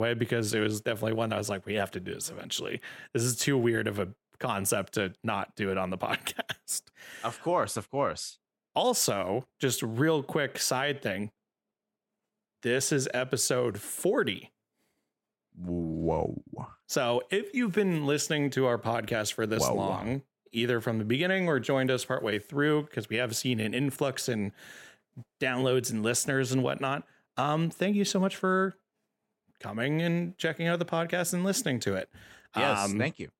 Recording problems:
abrupt cut into speech; at the start

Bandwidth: 16.5 kHz